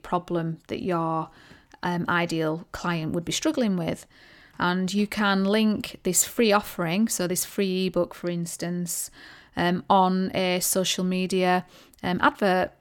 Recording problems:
none

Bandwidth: 17 kHz